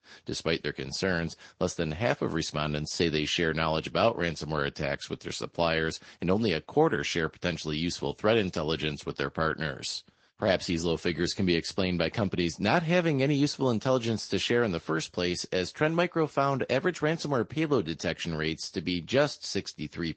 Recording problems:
high frequencies cut off; noticeable; nothing above 8 kHz
garbled, watery; slightly

